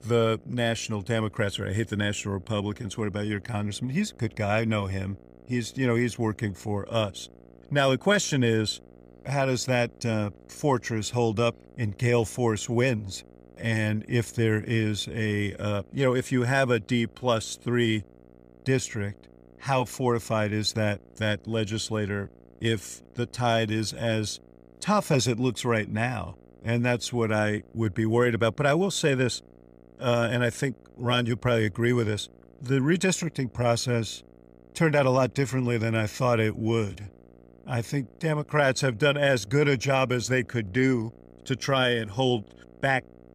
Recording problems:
electrical hum; faint; throughout; 60 Hz, 30 dB below the speech

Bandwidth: 15 kHz